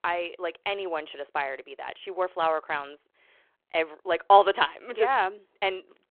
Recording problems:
phone-call audio

